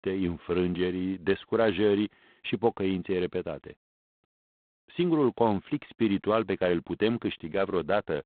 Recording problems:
phone-call audio; poor line; nothing above 3.5 kHz

